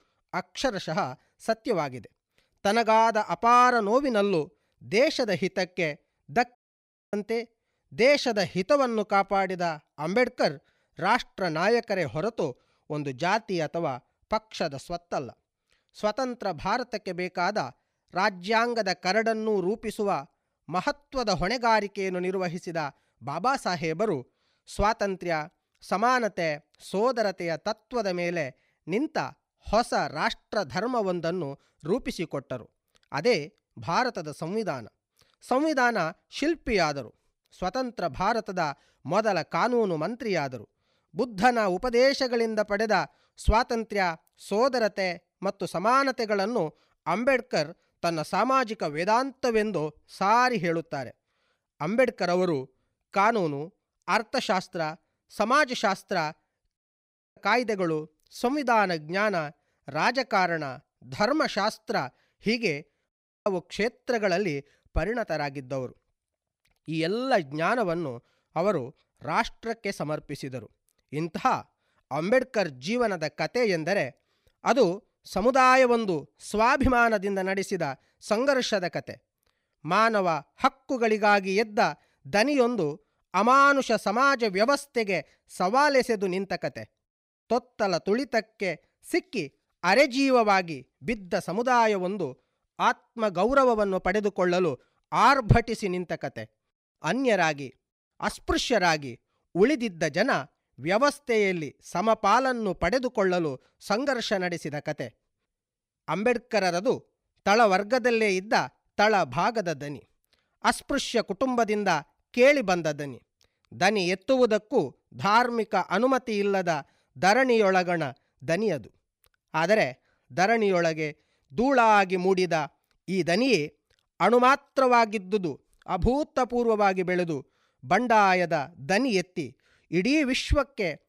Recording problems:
audio cutting out; at 6.5 s for 0.5 s, at 57 s for 0.5 s and at 1:03

